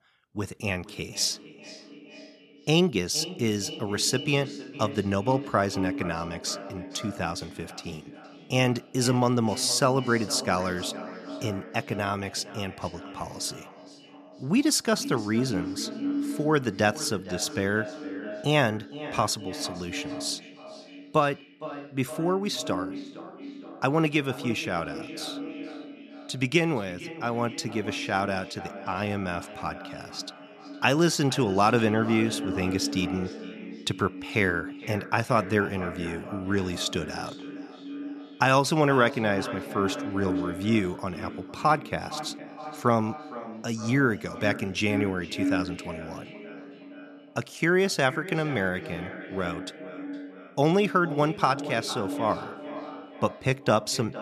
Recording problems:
echo of what is said; strong; throughout; 460 ms later, 10 dB below the speech

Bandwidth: 13.5 kHz